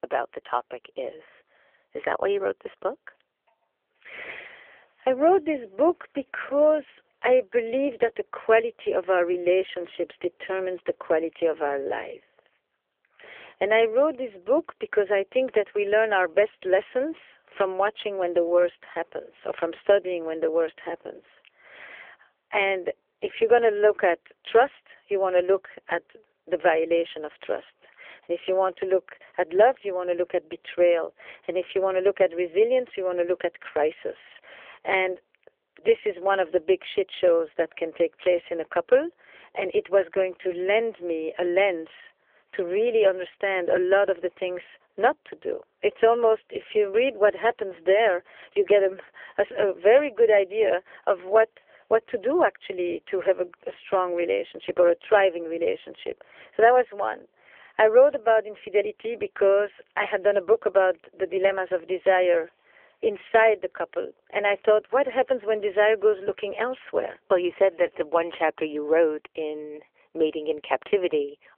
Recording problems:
phone-call audio; poor line; nothing above 3.5 kHz

